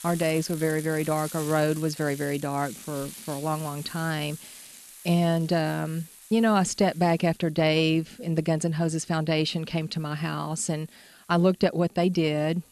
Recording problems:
household noises; noticeable; throughout; 15 dB below the speech

